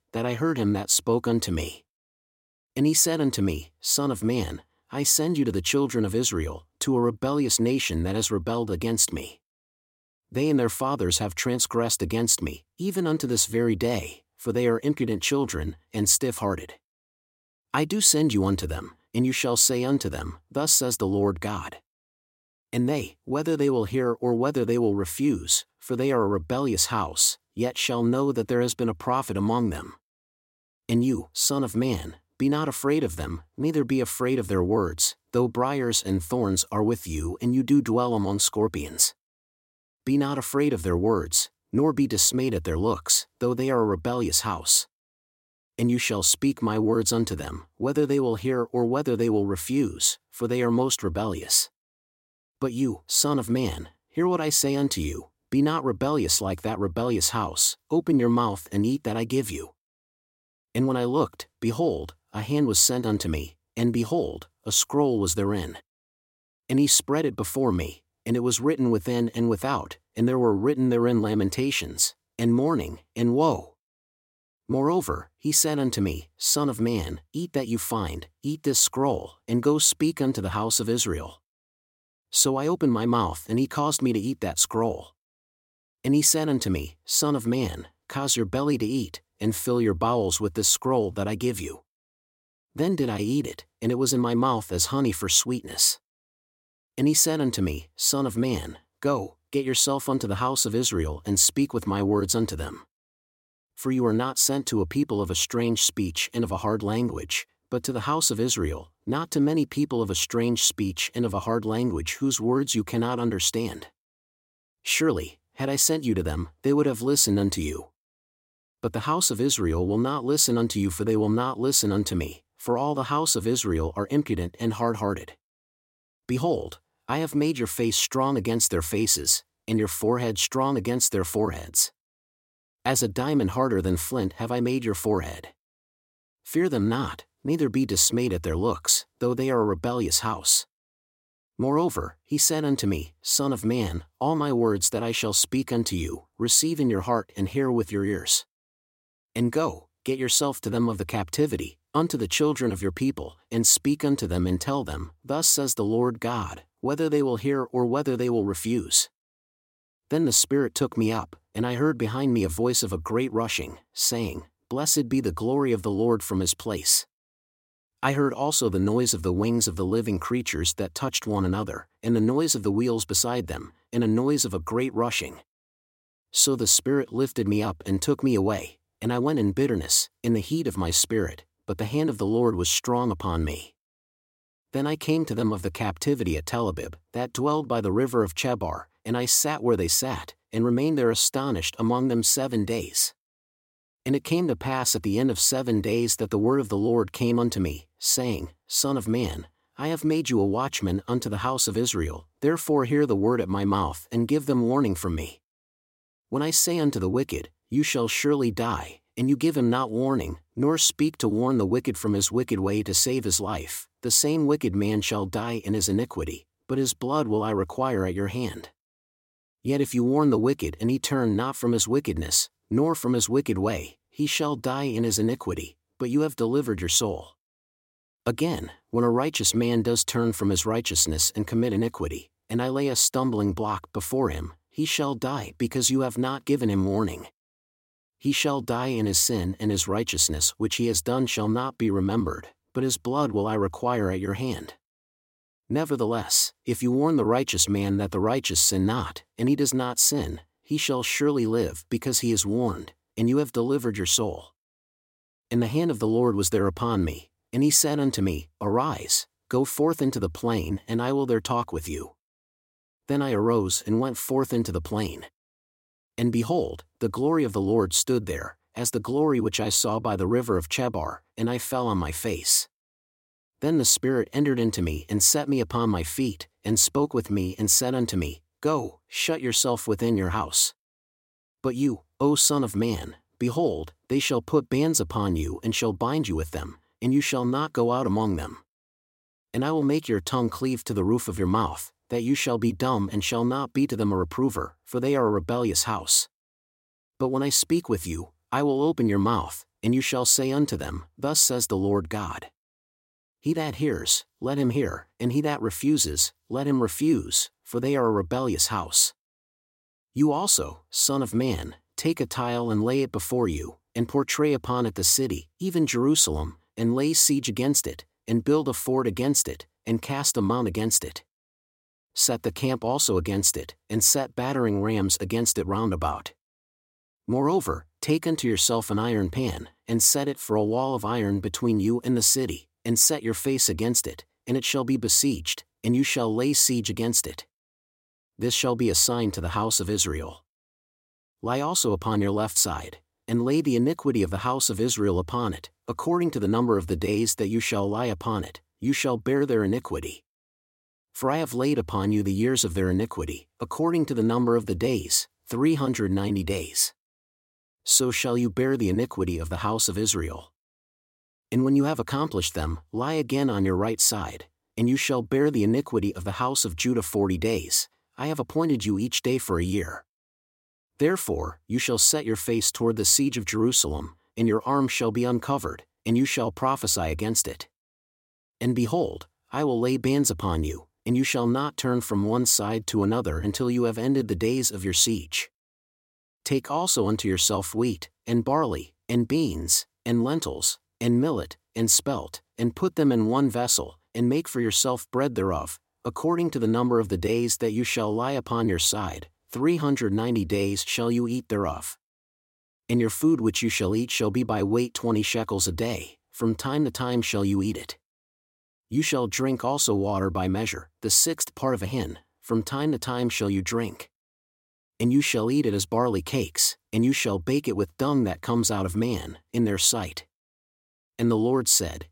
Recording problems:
none

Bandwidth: 16.5 kHz